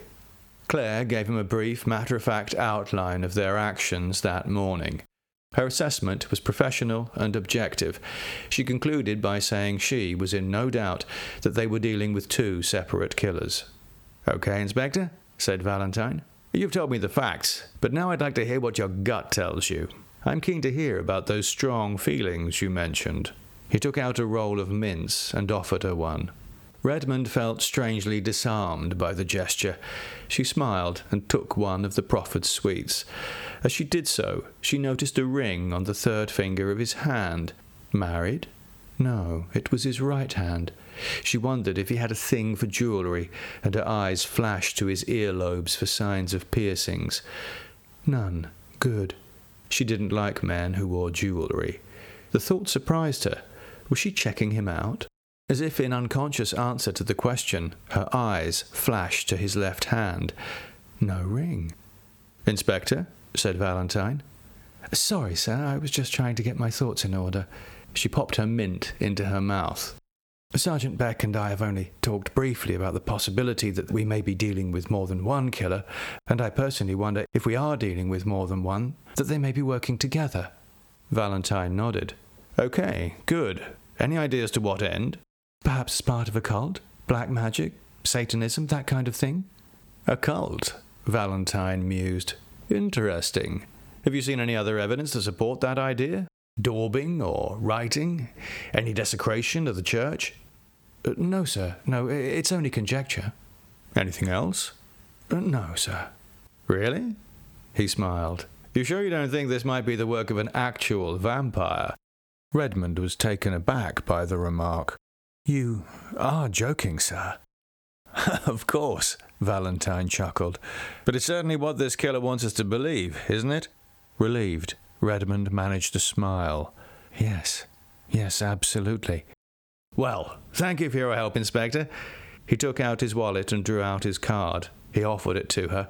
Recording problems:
squashed, flat; somewhat

